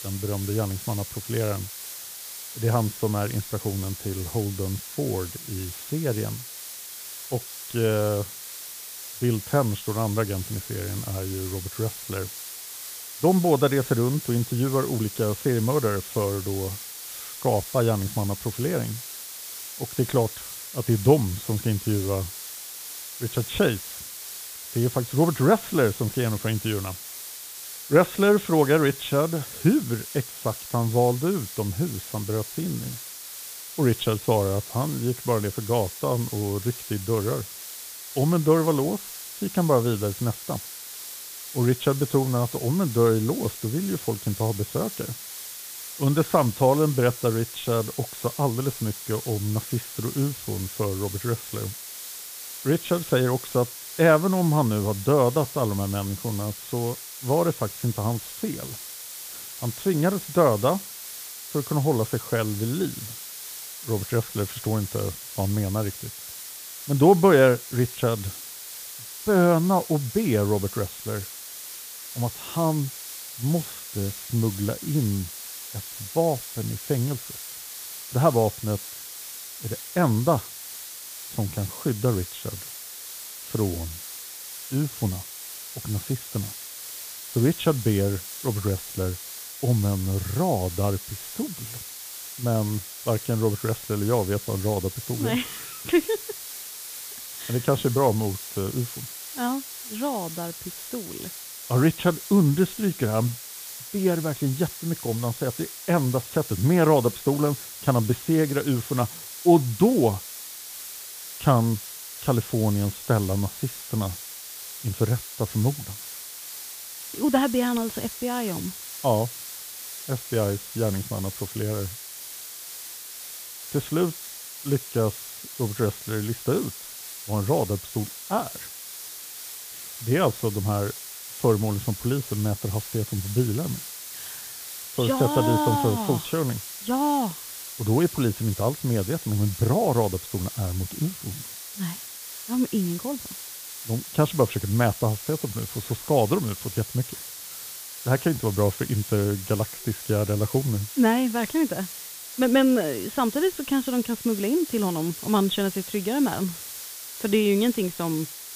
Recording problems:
high frequencies cut off; severe; nothing above 4 kHz
hiss; loud; throughout; 10 dB below the speech

